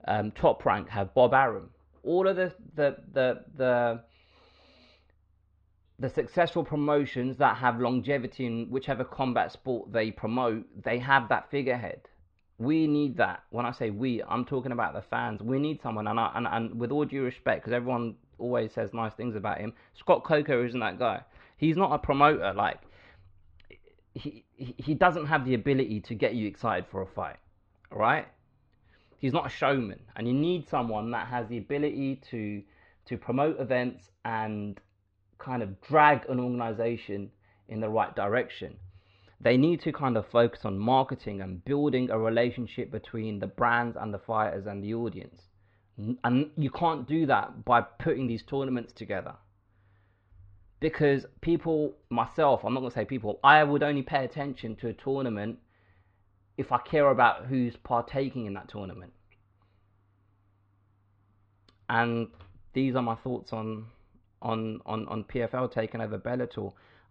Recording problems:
muffled; slightly; fading above 3.5 kHz

